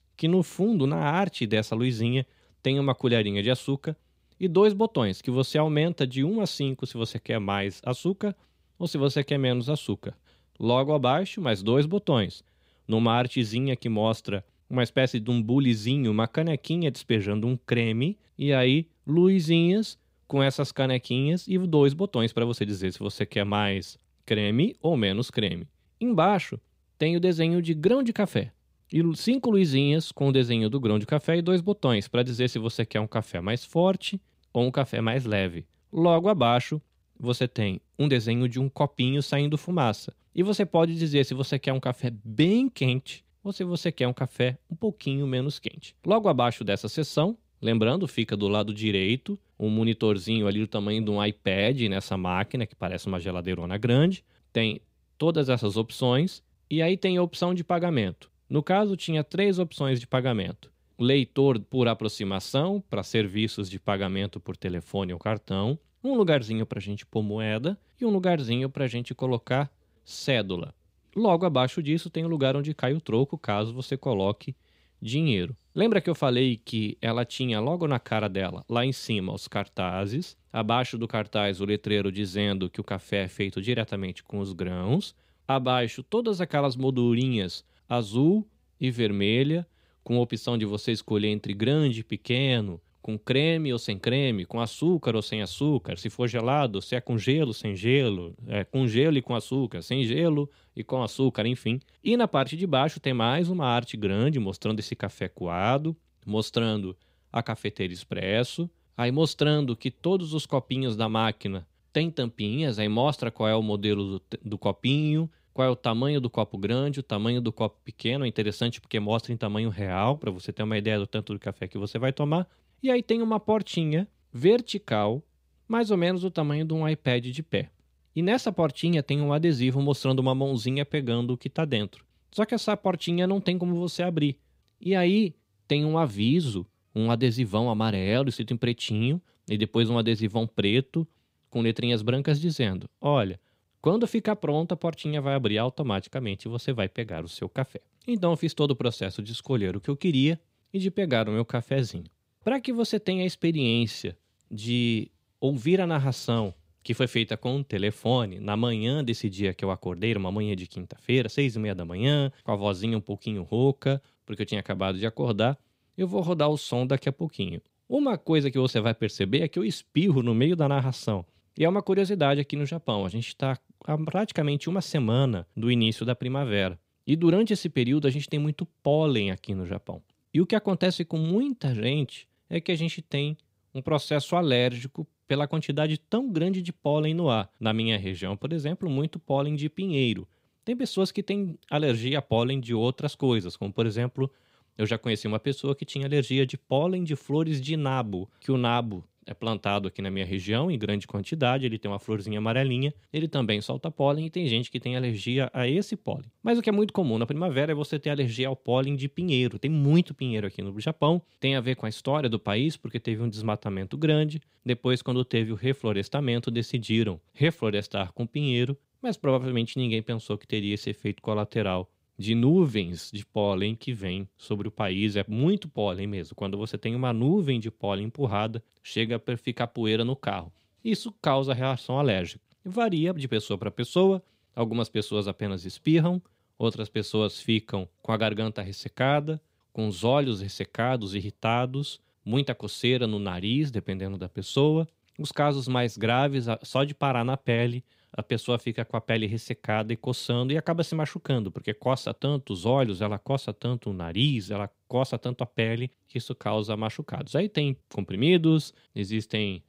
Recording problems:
none

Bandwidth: 15.5 kHz